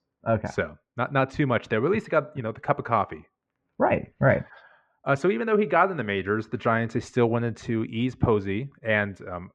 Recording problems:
muffled; very; fading above 2 kHz

